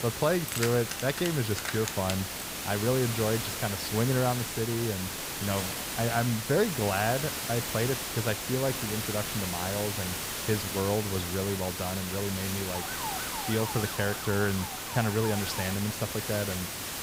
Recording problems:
hiss; loud; throughout; 2 dB below the speech
jangling keys; noticeable; until 2.5 s; peak 2 dB below the speech
clattering dishes; faint; at 5.5 s; peak 10 dB below the speech
siren; noticeable; from 13 to 16 s; peak 7 dB below the speech

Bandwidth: 15.5 kHz